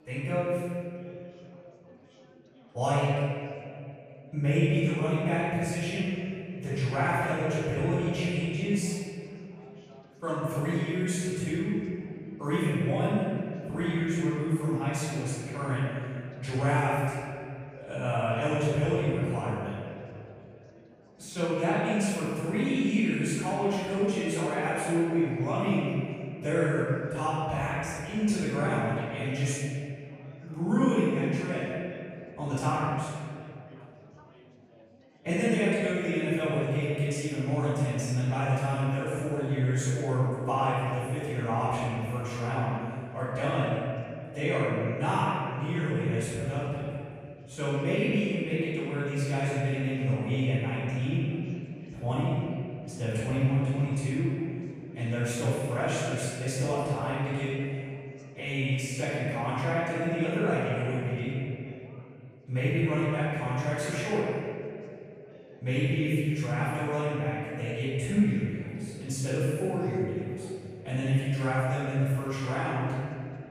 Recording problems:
room echo; strong; dies away in 2.4 s
off-mic speech; far
chatter from many people; faint; throughout; 25 dB below the speech

